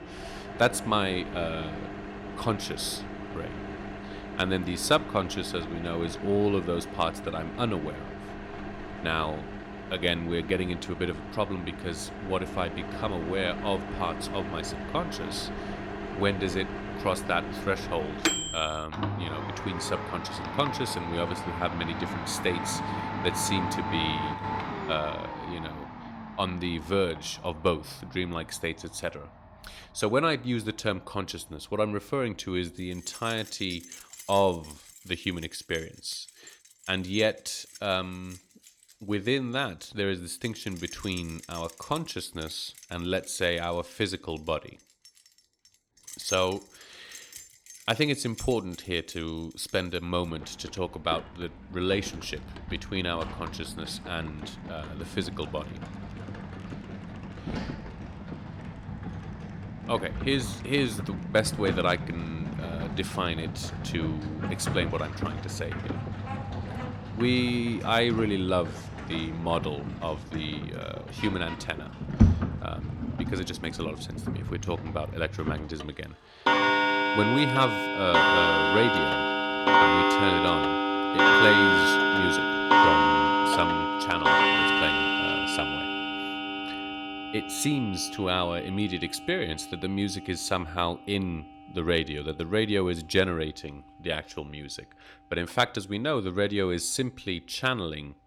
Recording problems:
household noises; very loud; throughout; 1 dB above the speech

